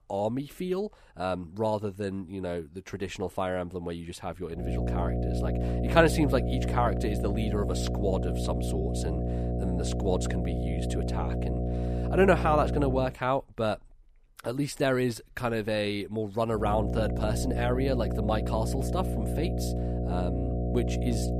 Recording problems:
electrical hum; loud; from 4.5 to 13 s and from 17 s on; 60 Hz, 6 dB below the speech

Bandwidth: 14.5 kHz